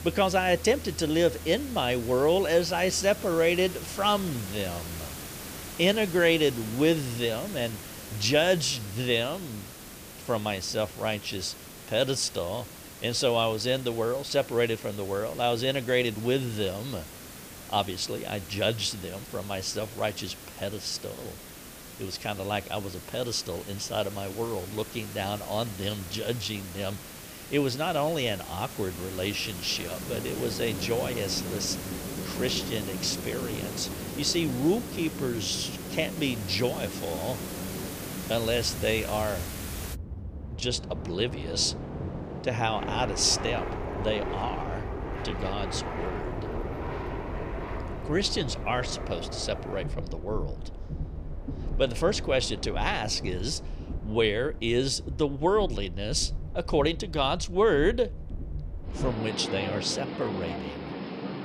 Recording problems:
train or aircraft noise; loud; from 30 s on; 8 dB below the speech
hiss; noticeable; until 40 s; 10 dB below the speech
background music; faint; throughout; 20 dB below the speech

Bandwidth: 15 kHz